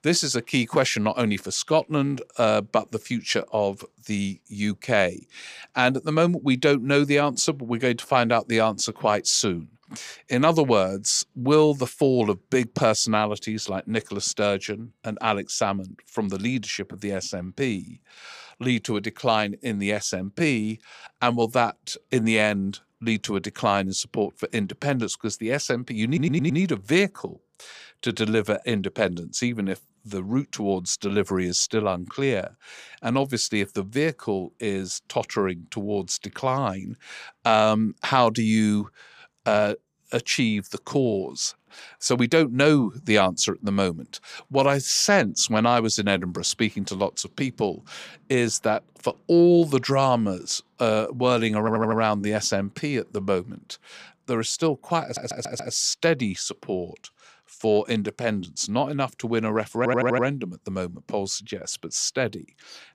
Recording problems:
audio stuttering; 4 times, first at 26 s

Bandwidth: 15 kHz